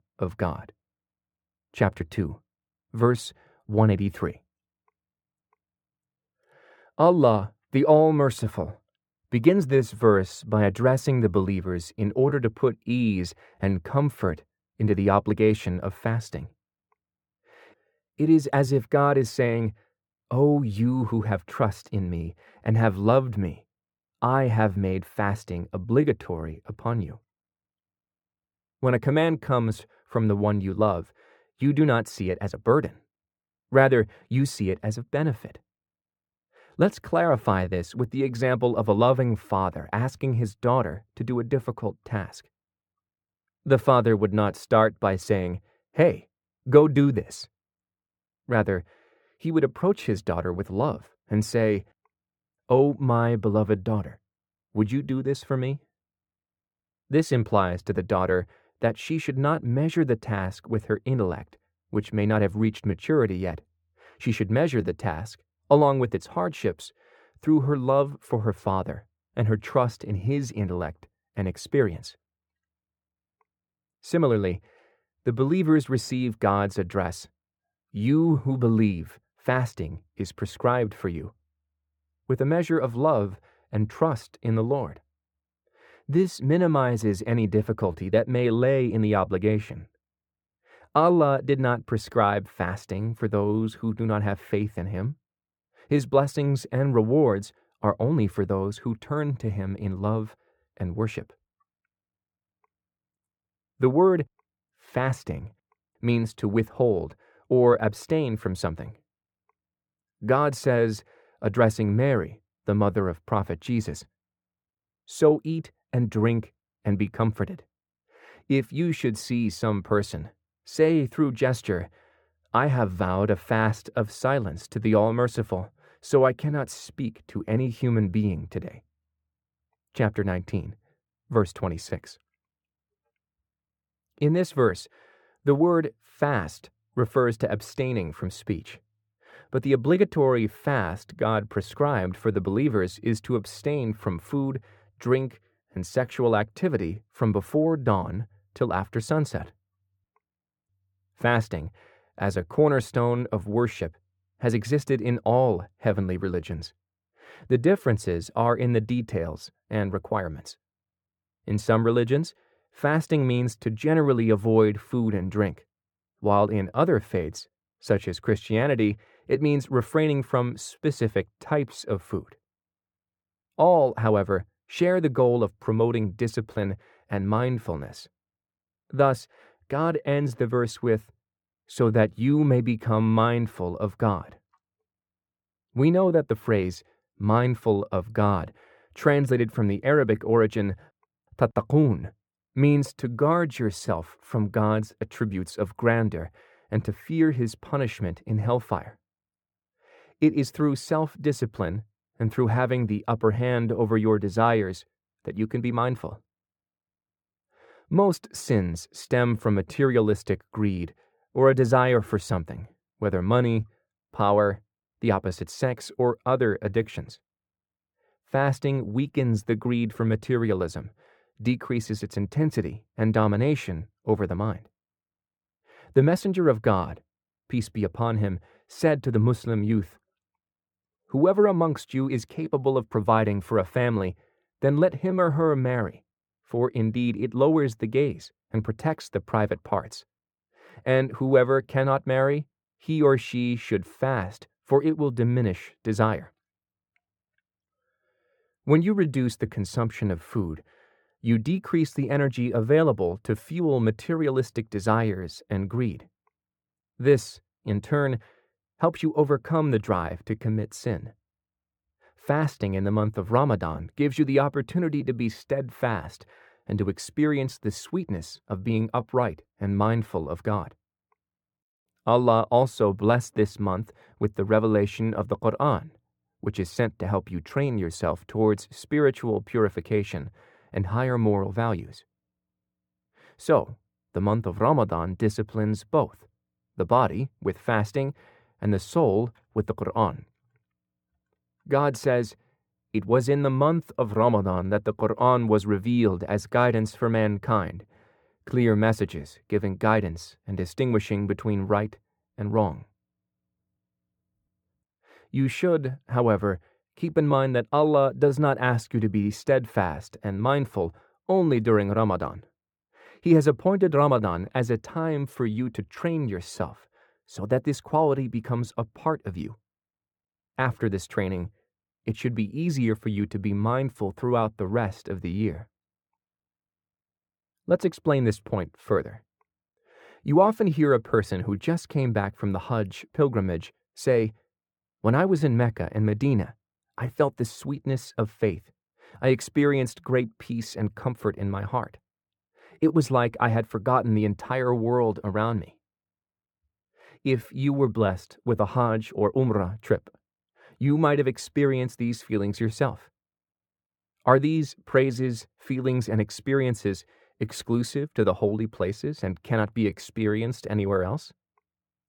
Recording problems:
muffled; very; fading above 3 kHz

